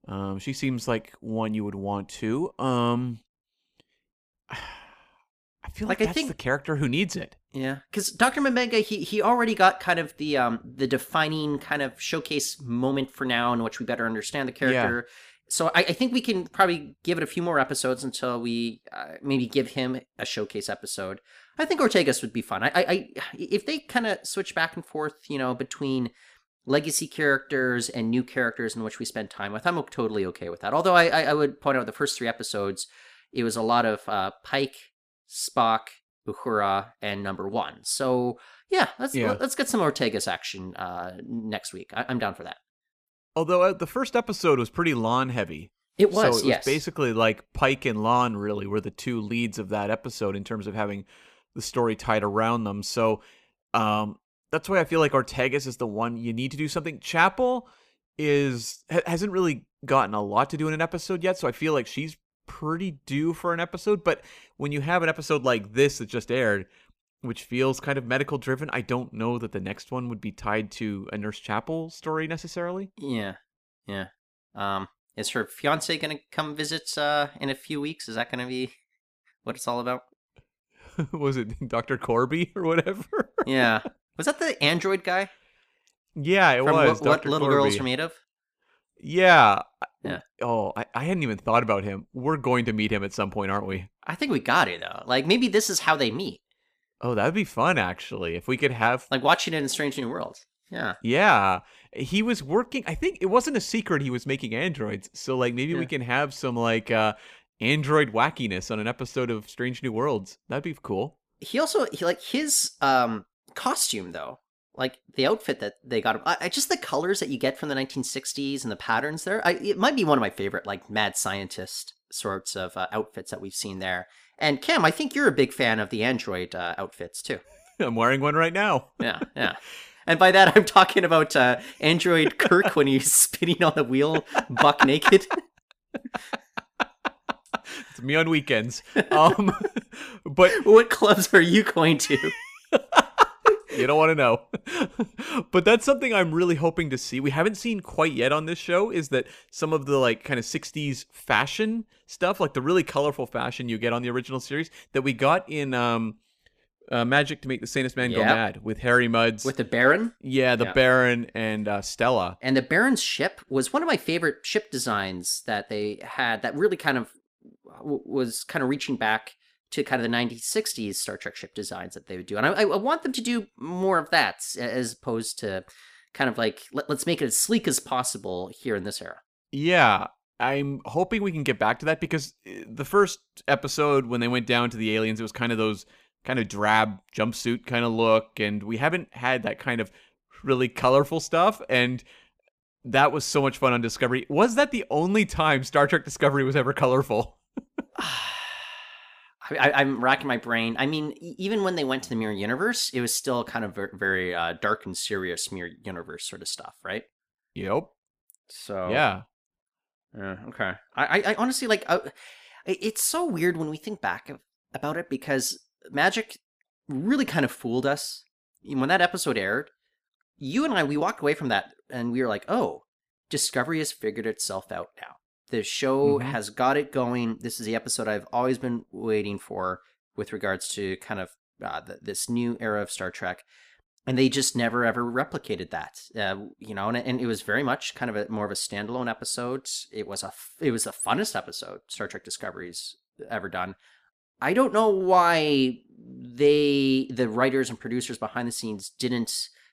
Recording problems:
none

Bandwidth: 15 kHz